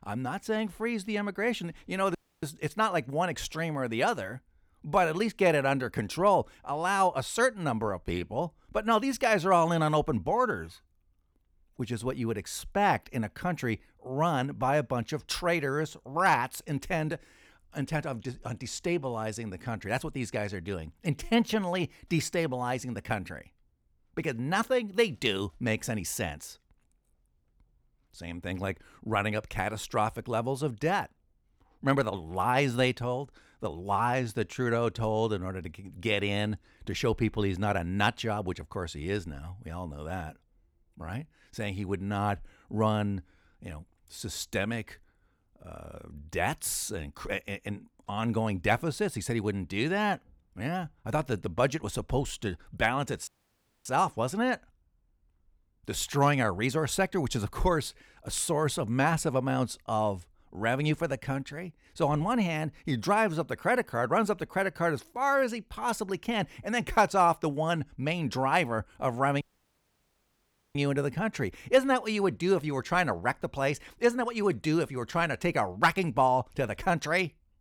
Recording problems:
audio cutting out; at 2 s, at 53 s for 0.5 s and at 1:09 for 1.5 s

